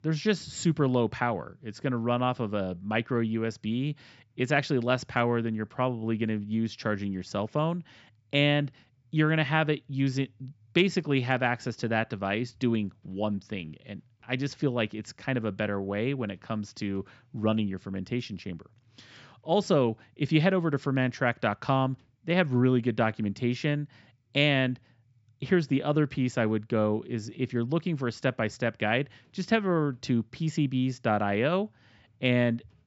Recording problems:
high frequencies cut off; noticeable; nothing above 8 kHz

